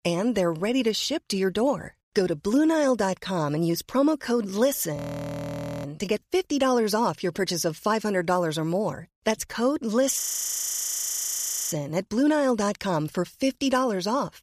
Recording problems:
audio freezing; at 5 s for 1 s and at 10 s for 1.5 s

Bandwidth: 14.5 kHz